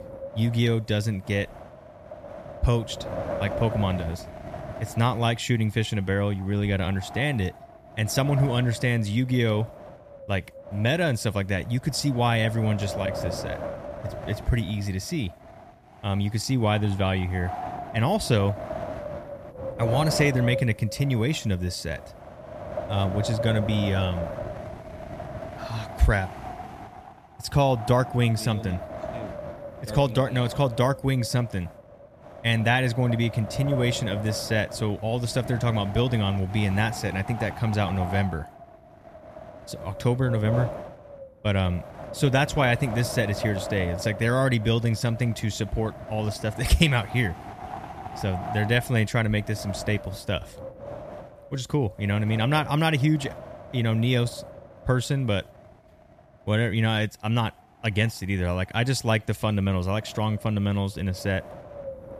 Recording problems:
wind noise on the microphone; heavy; 8 dB below the speech

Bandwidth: 14.5 kHz